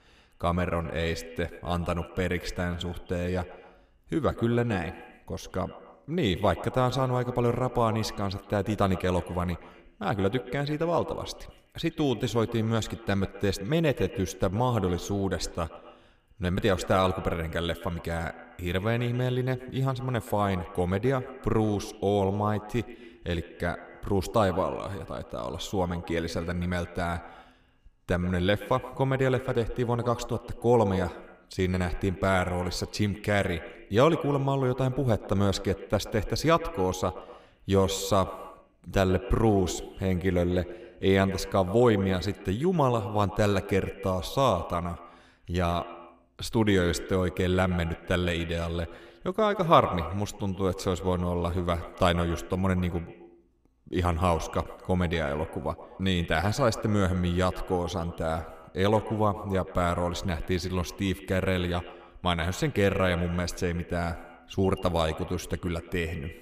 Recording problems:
echo of what is said; noticeable; throughout; 130 ms later, 15 dB below the speech

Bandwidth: 15 kHz